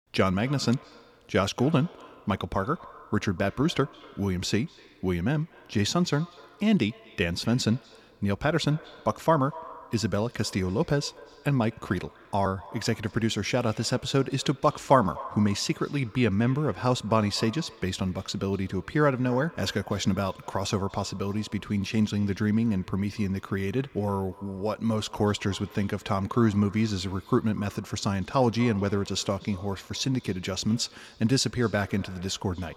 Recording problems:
echo of what is said; faint; throughout; 240 ms later, 20 dB below the speech

